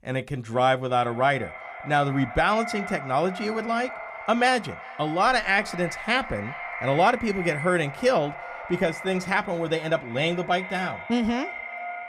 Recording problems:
echo of what is said; strong; throughout; 360 ms later, 10 dB below the speech

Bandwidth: 14.5 kHz